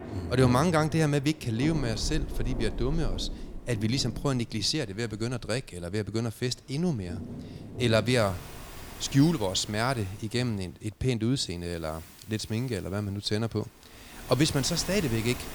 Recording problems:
rain or running water; noticeable; throughout; 10 dB below the speech

